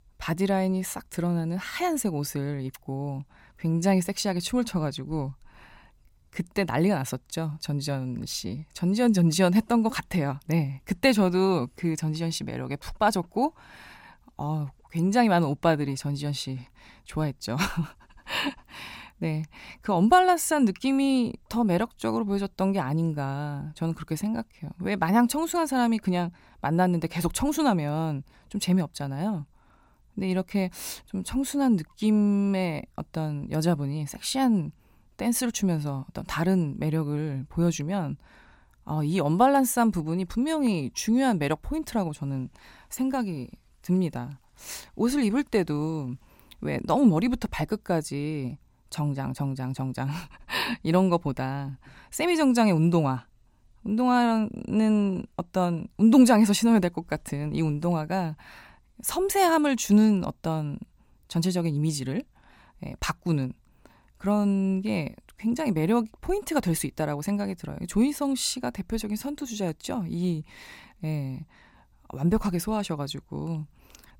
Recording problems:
none

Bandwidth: 16.5 kHz